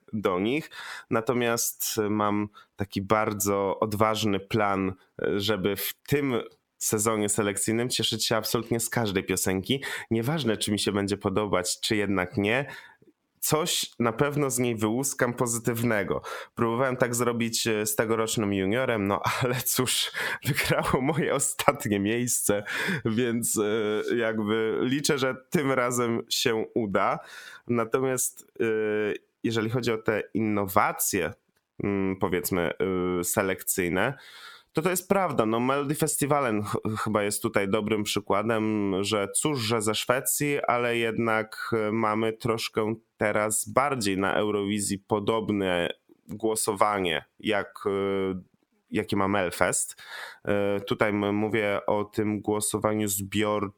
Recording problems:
squashed, flat; heavily

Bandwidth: 18.5 kHz